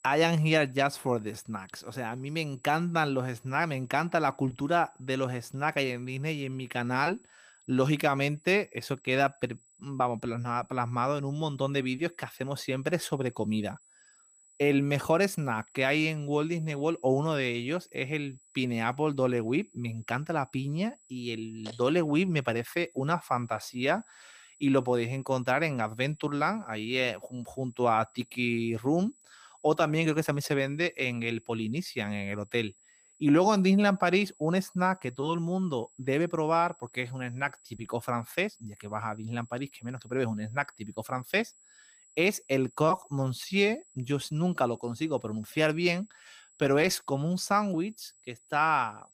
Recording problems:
high-pitched whine; faint; throughout; 7.5 kHz, 30 dB below the speech

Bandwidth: 15 kHz